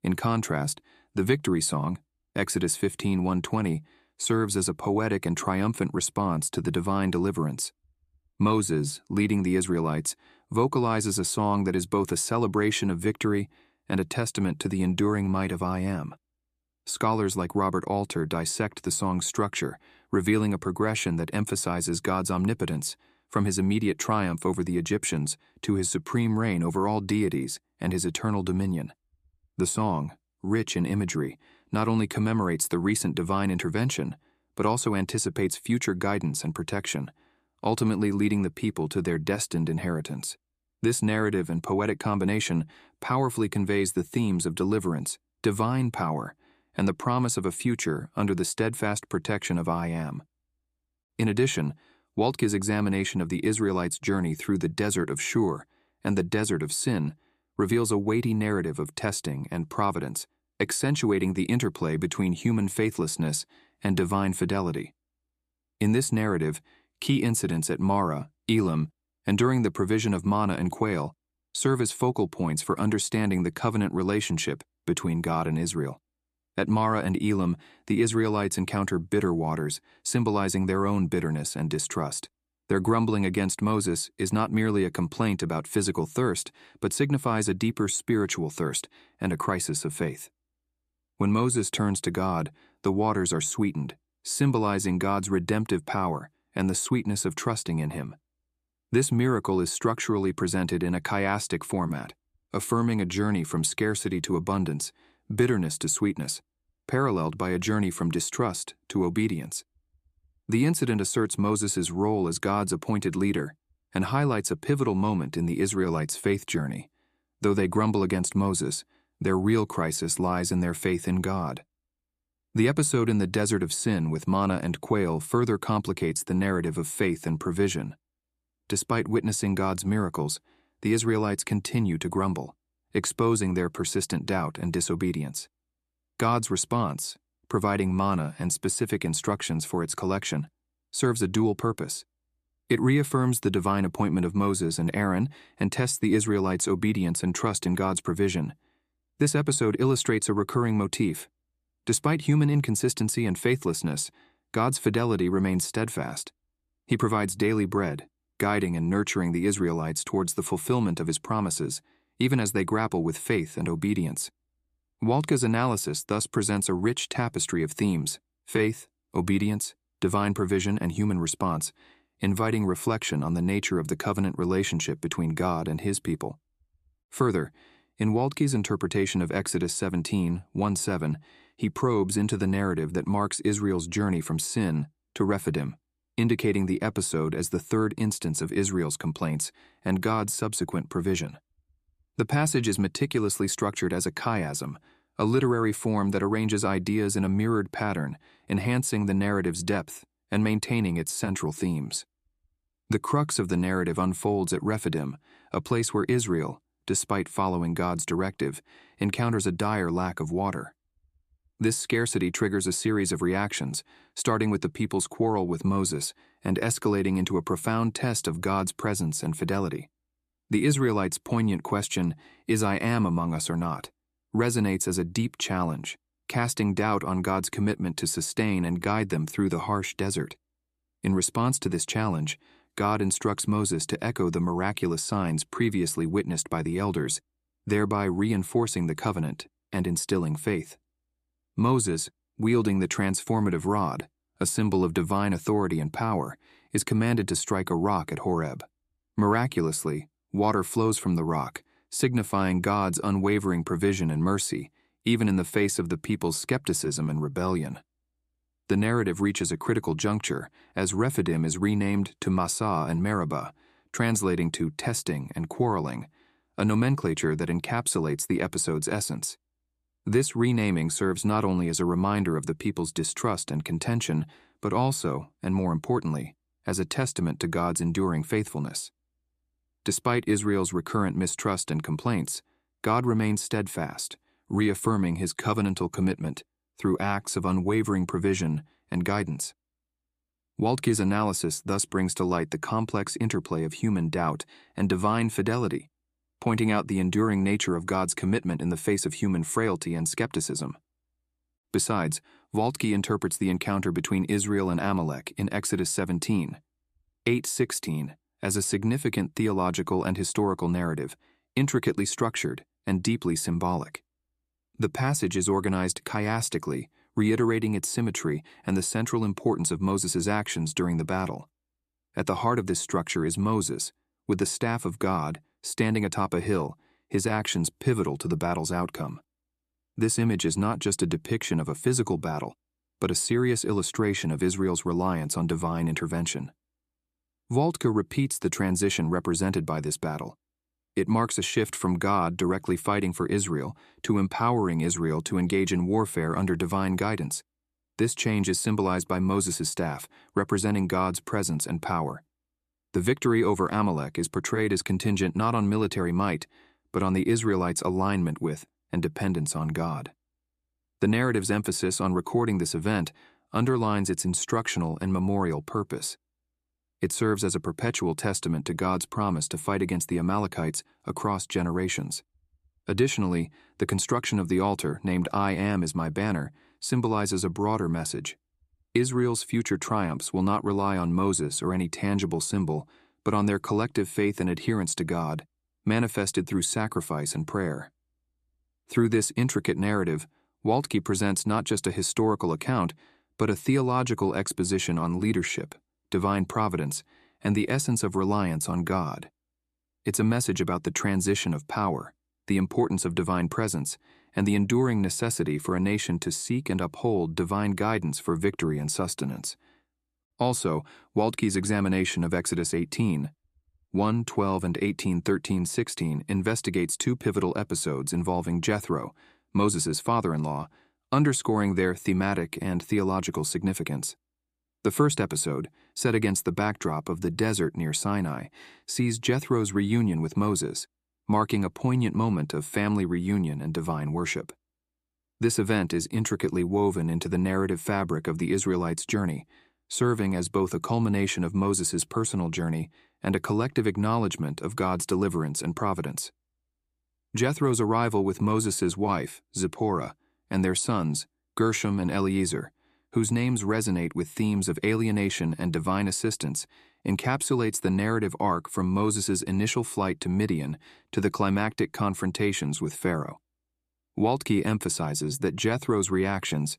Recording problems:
none

